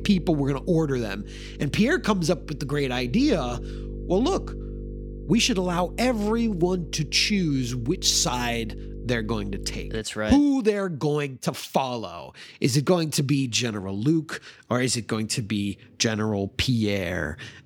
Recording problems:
electrical hum; noticeable; until 10 s; 50 Hz, 20 dB below the speech

